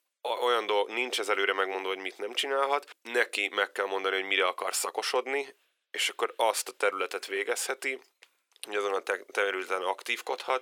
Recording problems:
thin; very; fading below 400 Hz

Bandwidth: 17.5 kHz